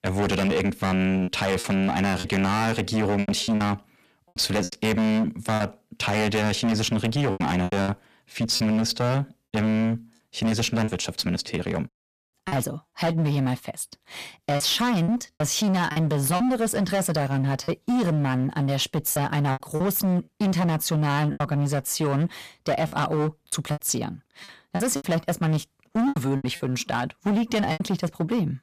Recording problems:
distortion; heavy; 20% of the sound clipped
choppy; very; 8% of the speech affected

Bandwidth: 14.5 kHz